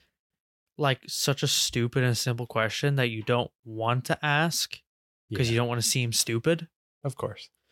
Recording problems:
none

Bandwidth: 16.5 kHz